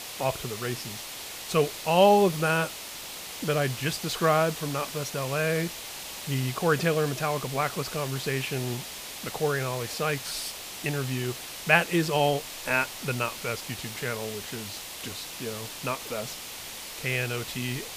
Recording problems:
hiss; loud; throughout; 9 dB below the speech

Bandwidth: 15 kHz